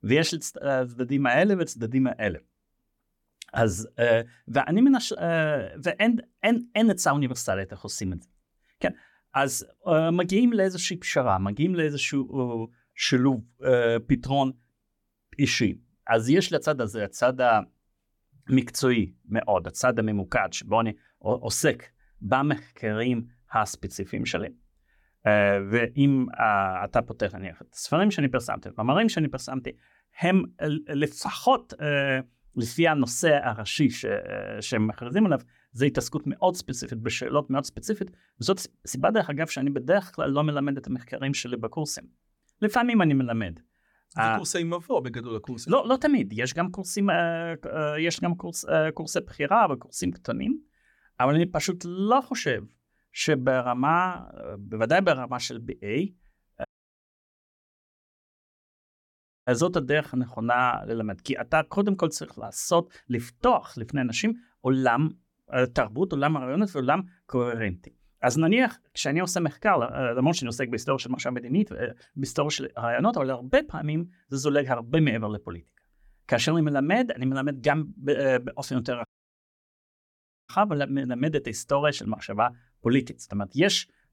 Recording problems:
audio cutting out; at 57 s for 3 s and at 1:19 for 1.5 s

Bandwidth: 17.5 kHz